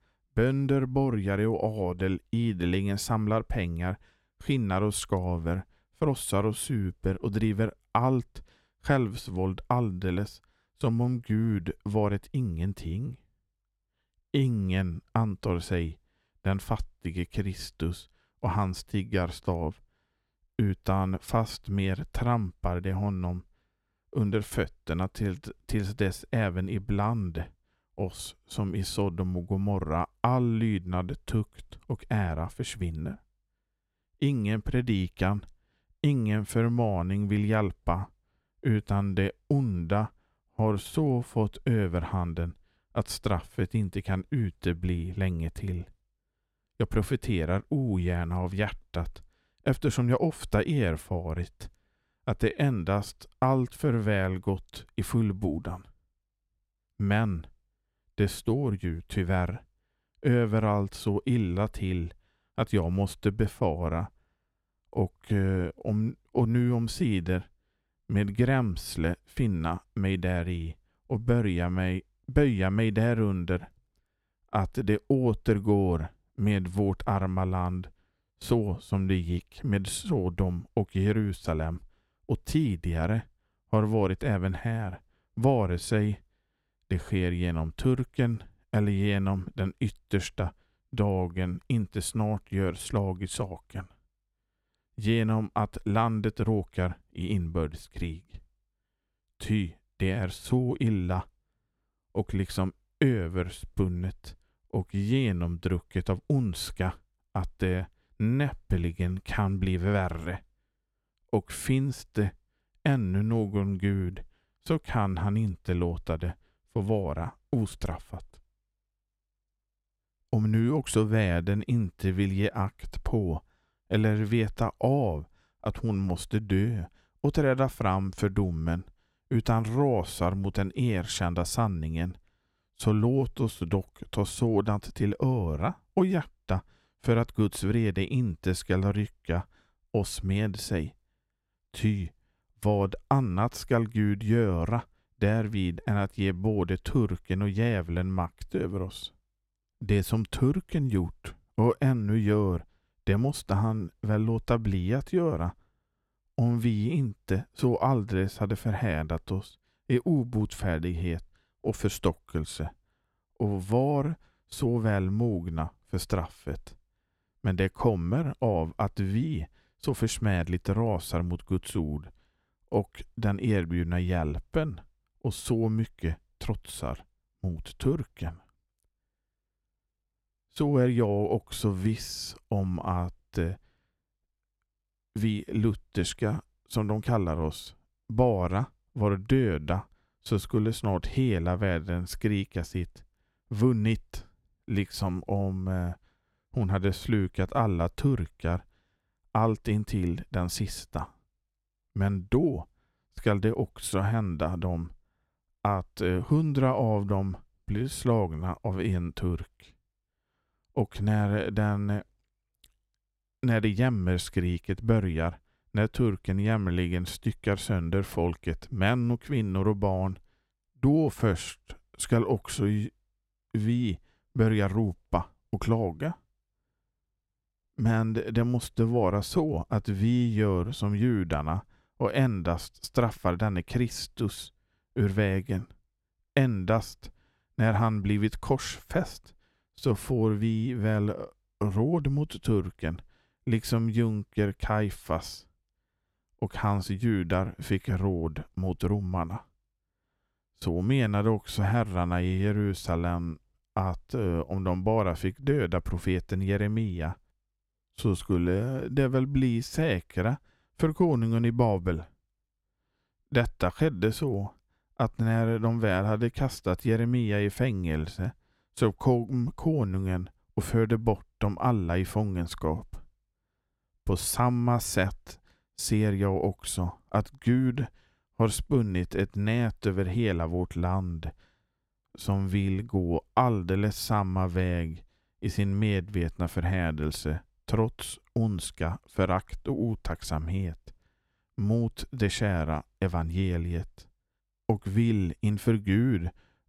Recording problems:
none

